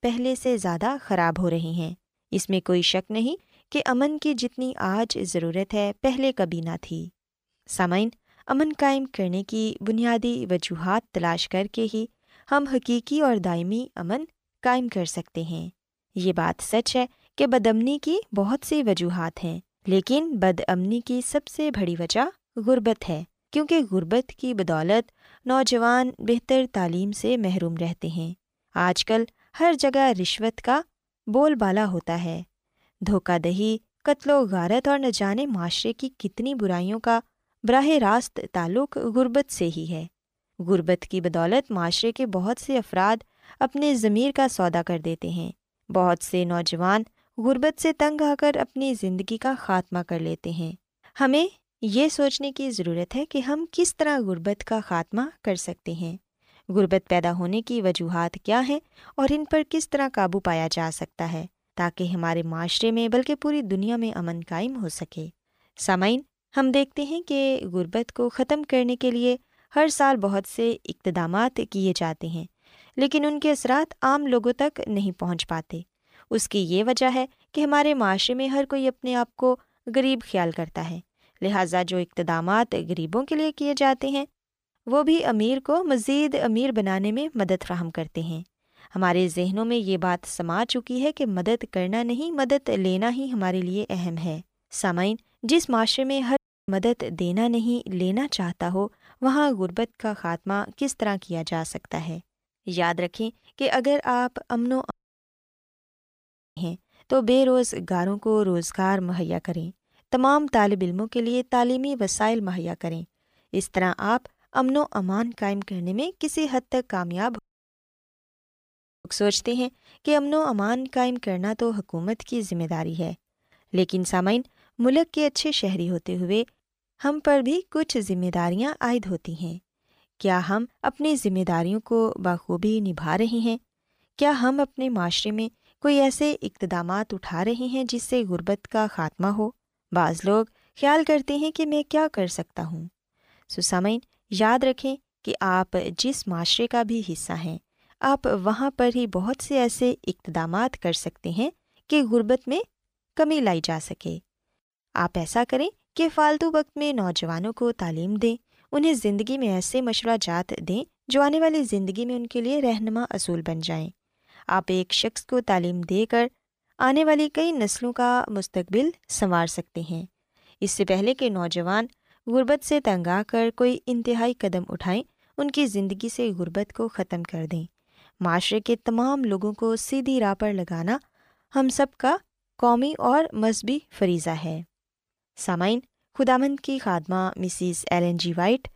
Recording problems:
audio cutting out; at 1:36, at 1:45 for 1.5 s and at 1:57 for 1.5 s

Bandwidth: 15 kHz